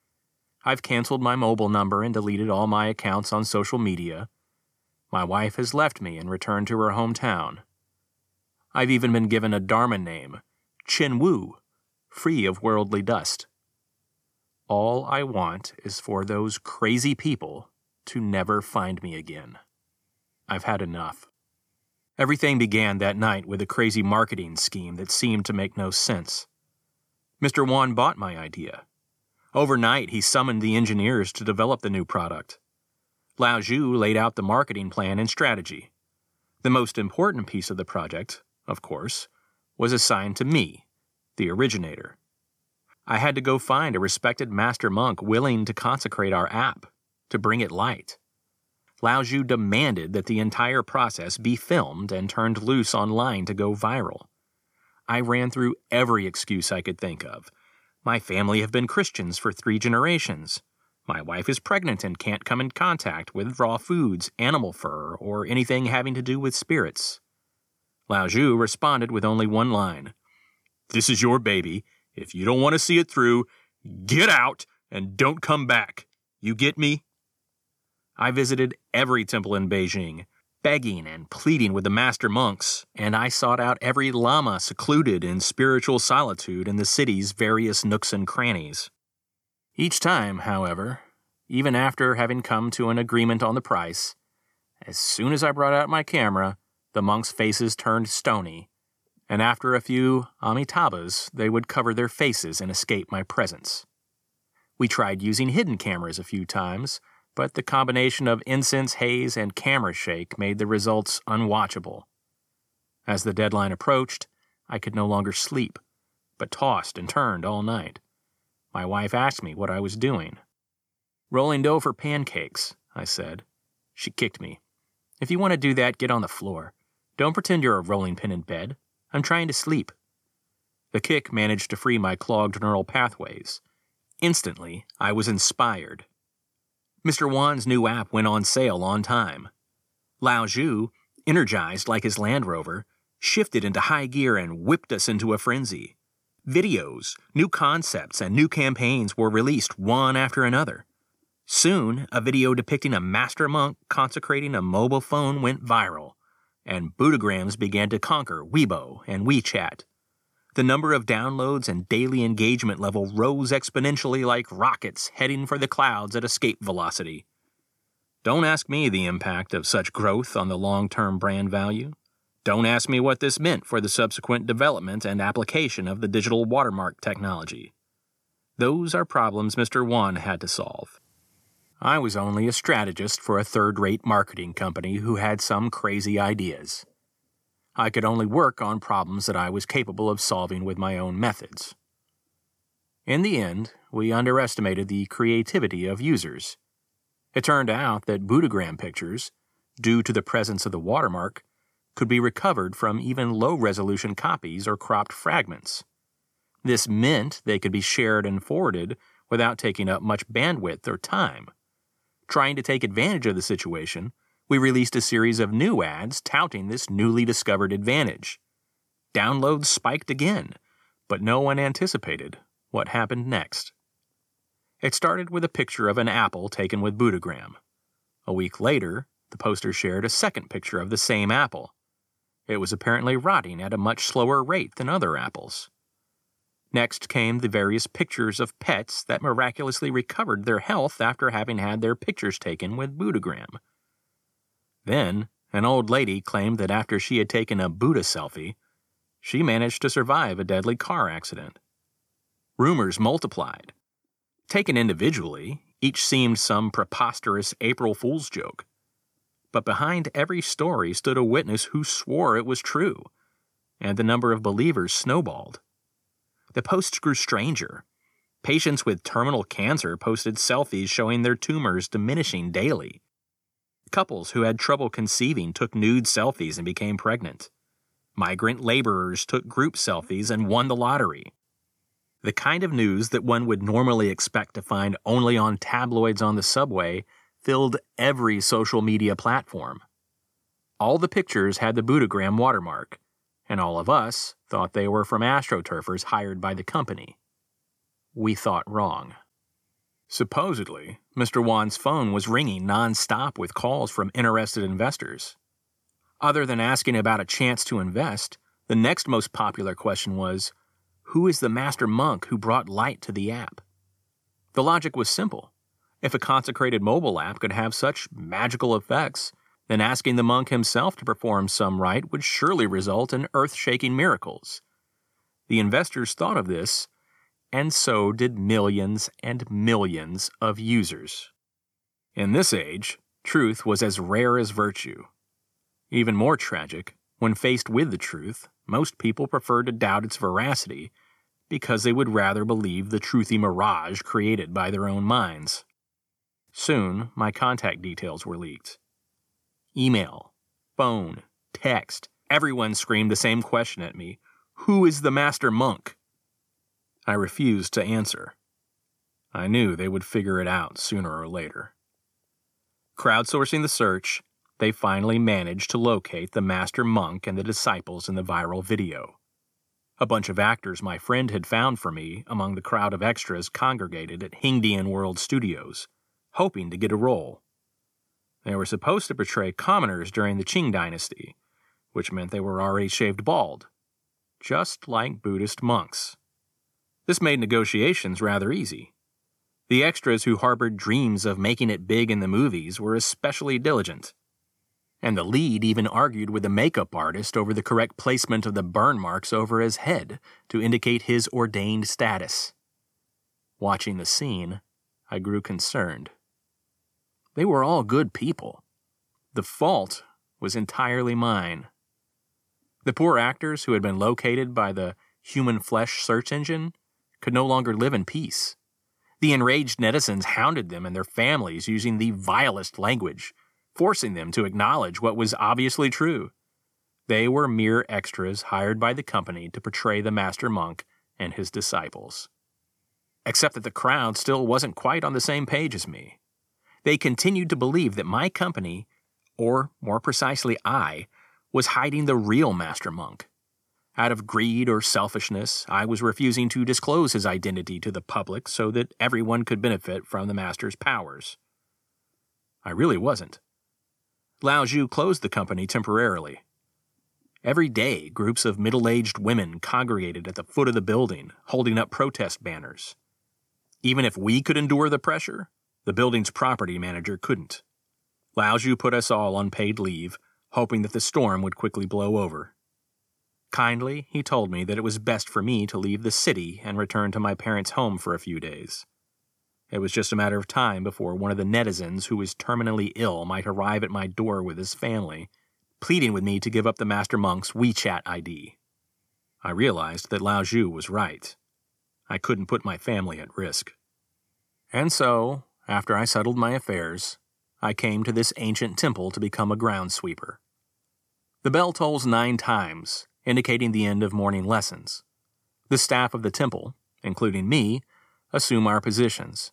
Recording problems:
none

